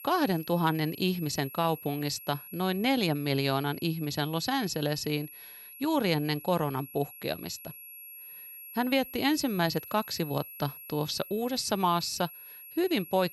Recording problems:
high-pitched whine; noticeable; throughout; 11.5 kHz, 15 dB below the speech

